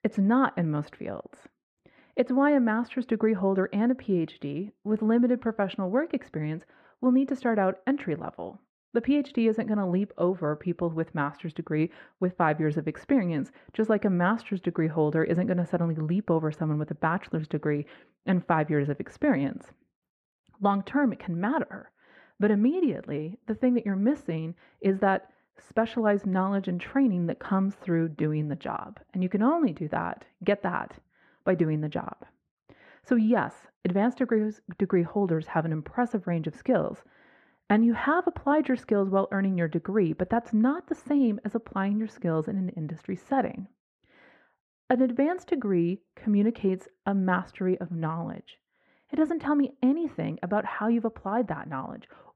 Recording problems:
muffled; very; fading above 3.5 kHz

